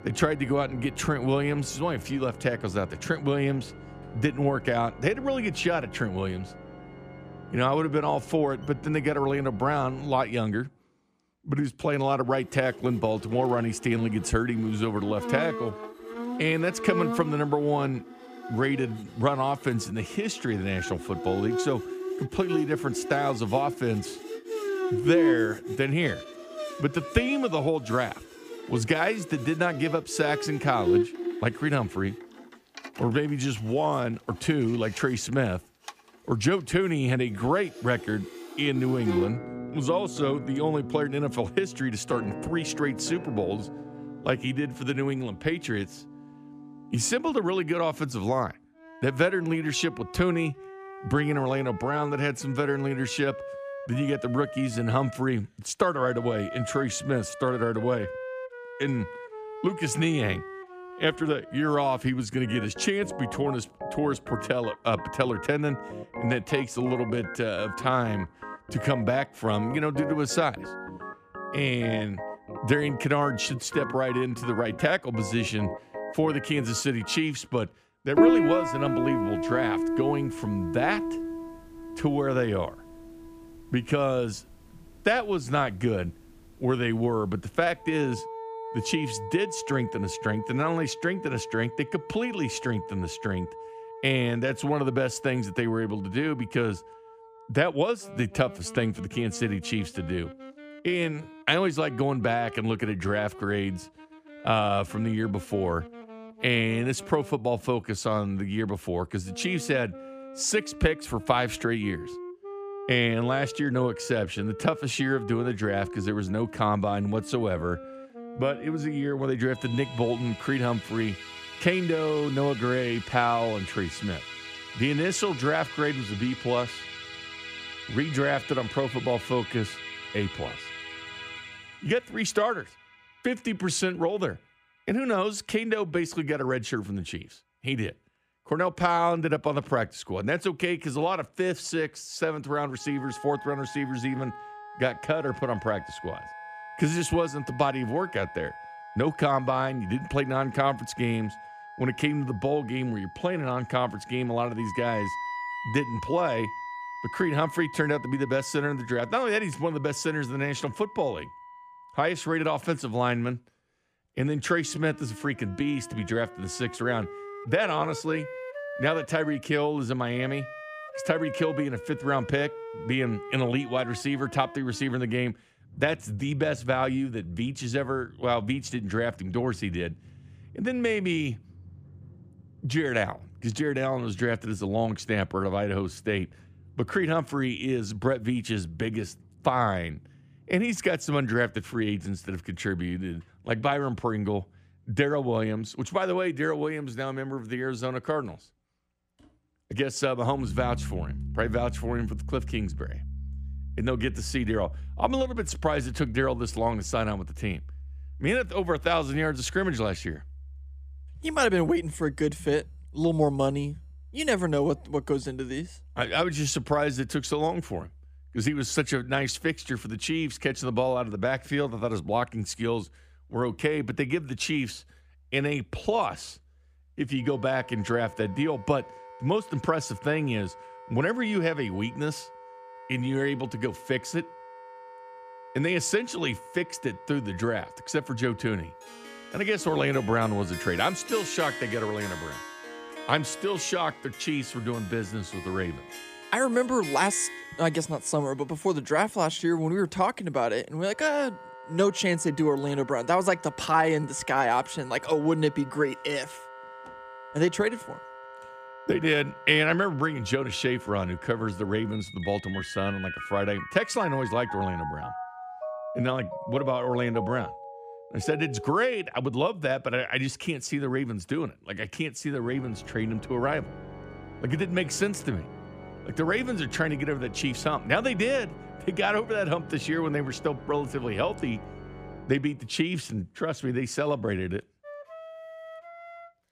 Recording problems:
background music; loud; throughout; 10 dB below the speech

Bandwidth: 15 kHz